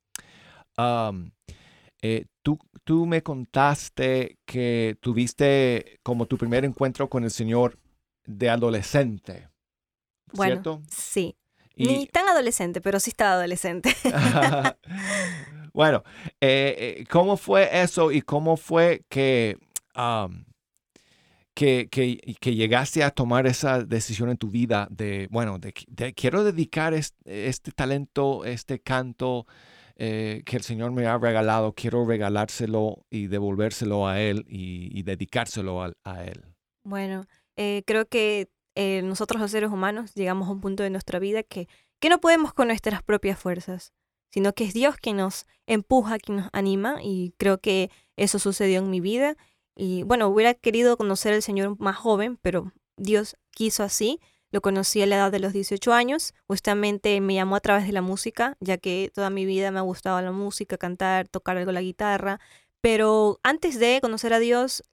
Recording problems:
uneven, jittery; strongly; from 15 s to 1:04

